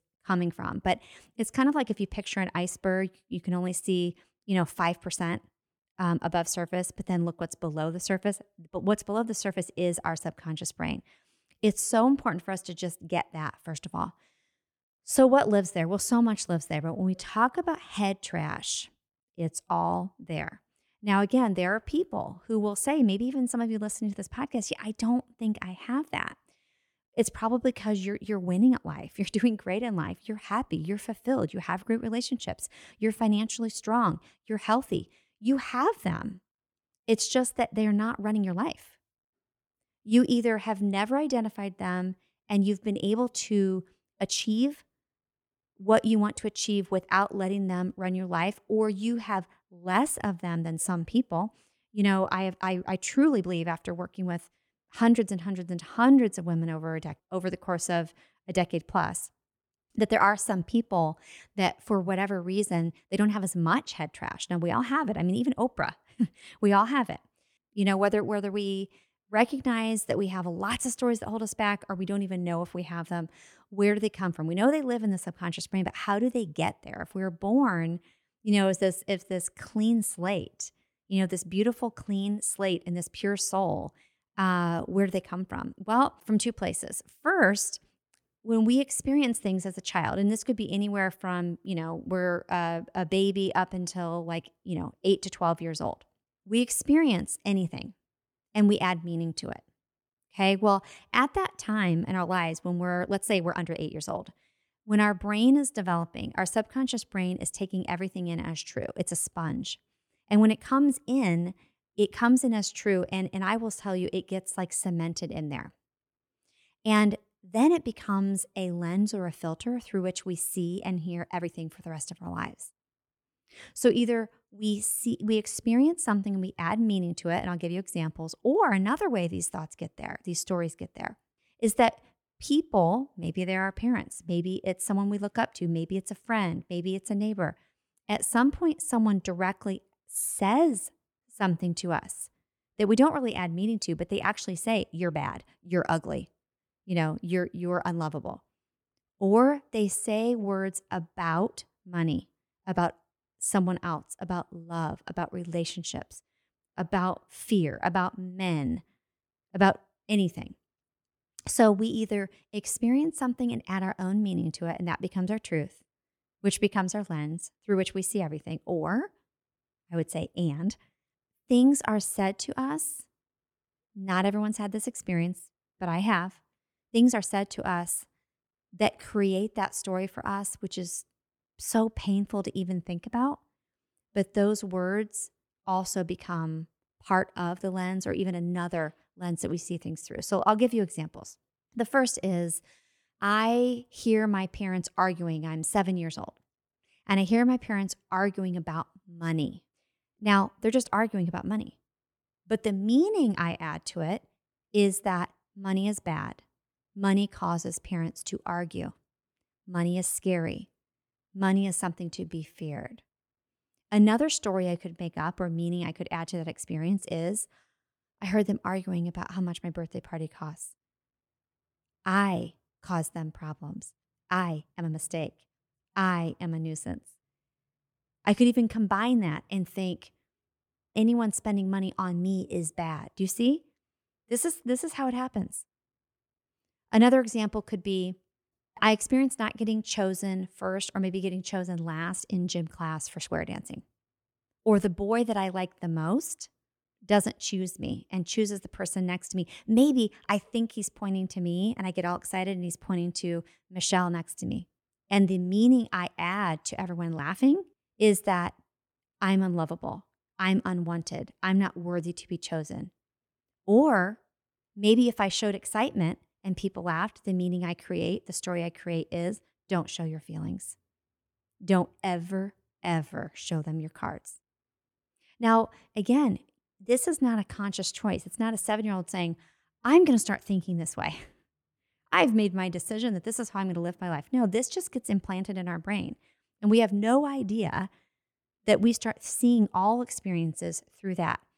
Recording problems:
uneven, jittery; strongly; from 17 s to 4:33

